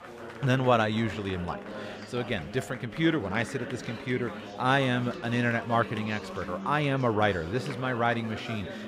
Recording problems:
chatter from many people; noticeable; throughout; 10 dB below the speech

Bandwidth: 15 kHz